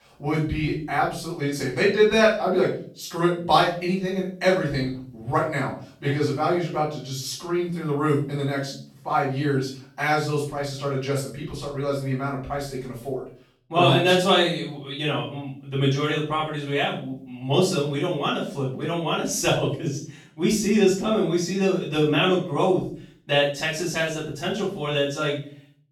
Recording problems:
off-mic speech; far
room echo; noticeable; dies away in 0.4 s

